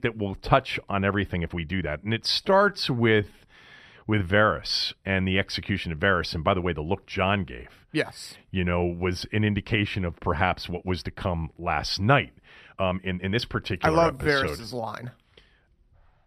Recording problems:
uneven, jittery; strongly; from 1.5 to 15 s

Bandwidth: 14.5 kHz